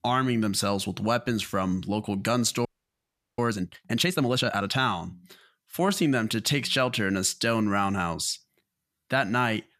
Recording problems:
audio freezing; at 2.5 s for 0.5 s

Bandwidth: 14.5 kHz